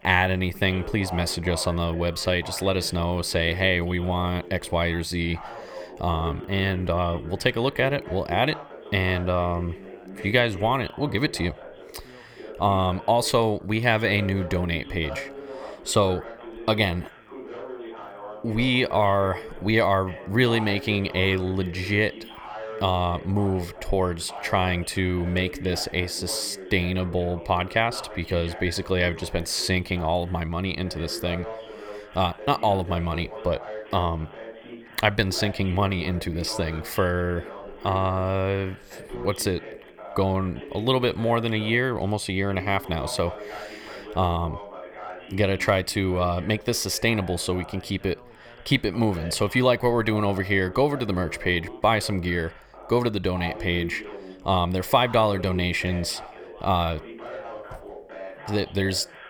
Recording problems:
background chatter; noticeable; throughout; 2 voices, 15 dB below the speech

